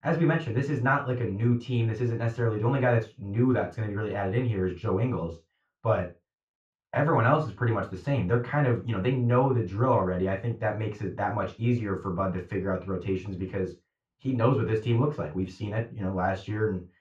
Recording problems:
off-mic speech; far
muffled; very; fading above 4 kHz
room echo; slight; dies away in 0.3 s

